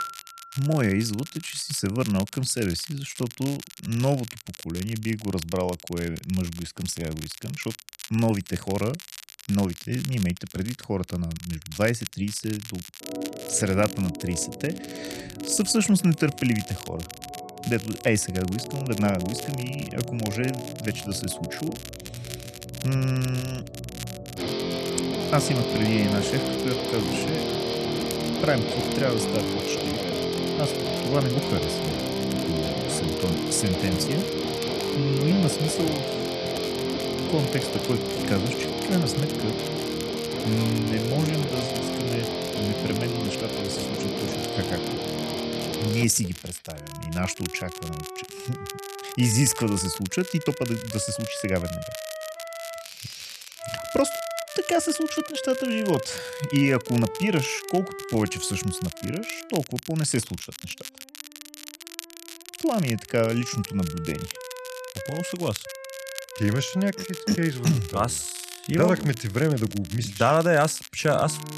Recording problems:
background music; loud; throughout; 4 dB below the speech
crackle, like an old record; noticeable; 15 dB below the speech

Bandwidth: 13.5 kHz